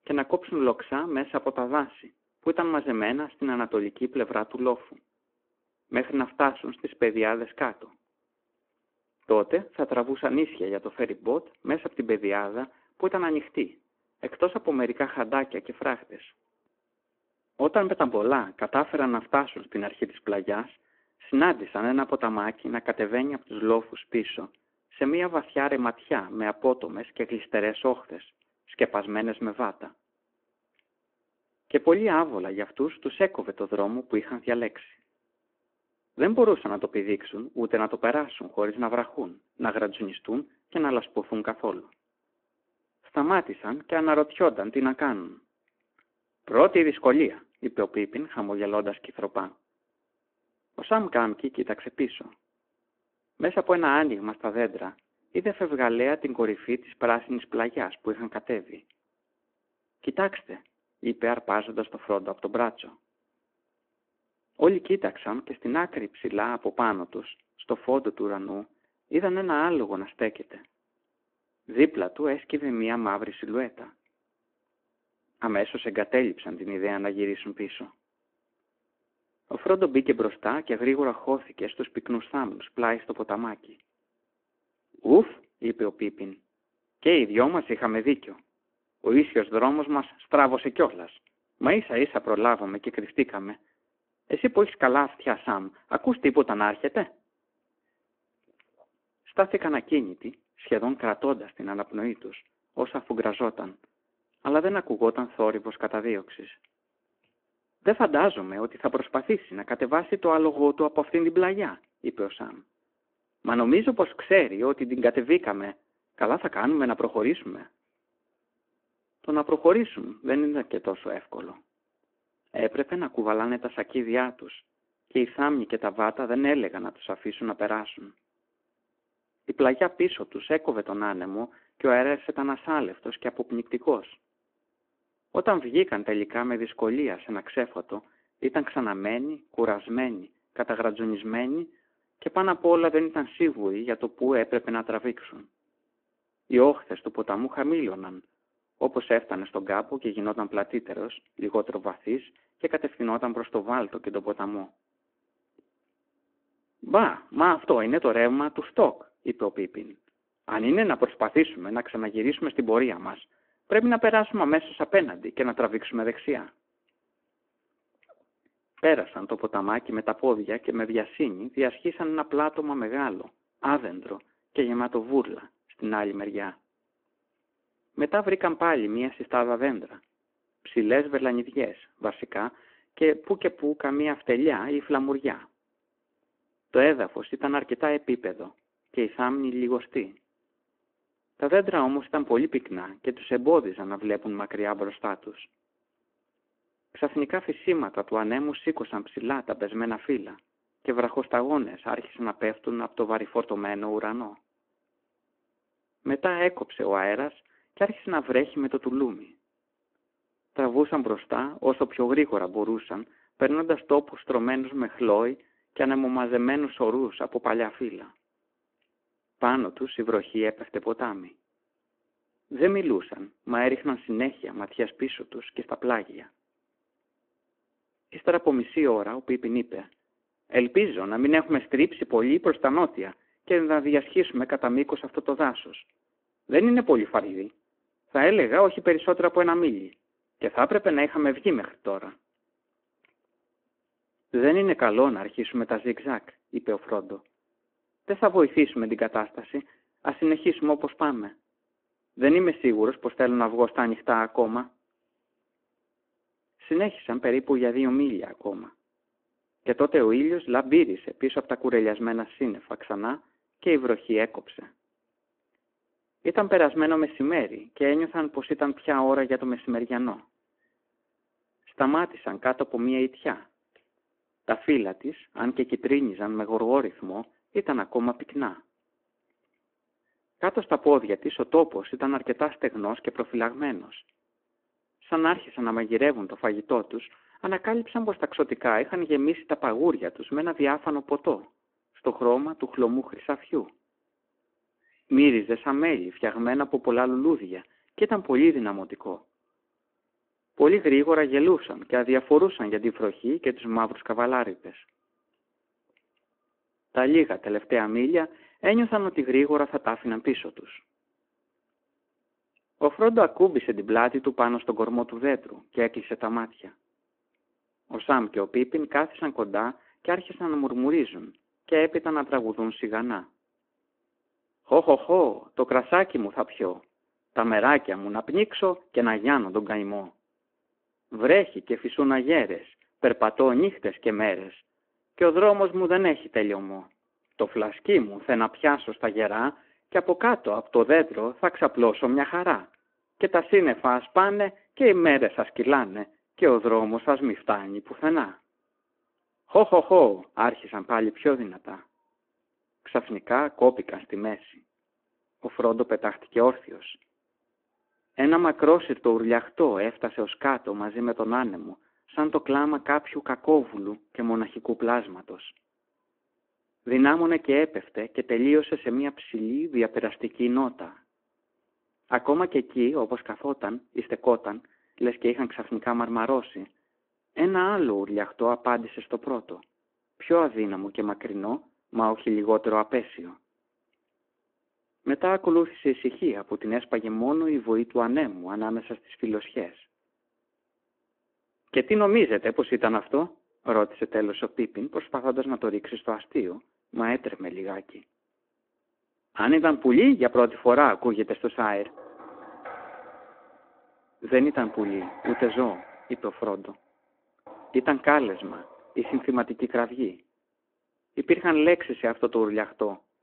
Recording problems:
phone-call audio
door banging; faint; from 6:42 to 6:49; peak 10 dB below the speech

